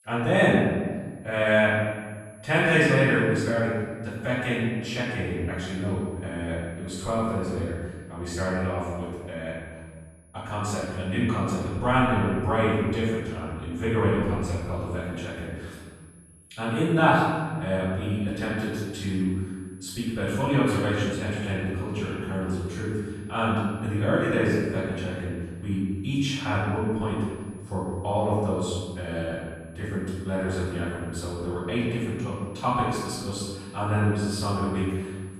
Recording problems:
room echo; strong; dies away in 1.5 s
off-mic speech; far
high-pitched whine; faint; throughout; 10.5 kHz, 30 dB below the speech

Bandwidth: 13.5 kHz